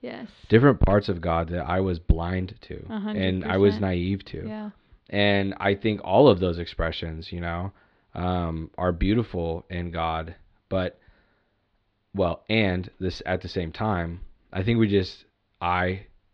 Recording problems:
muffled; slightly; fading above 4 kHz

